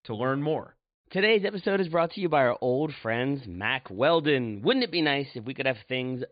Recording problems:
high frequencies cut off; severe; nothing above 4.5 kHz

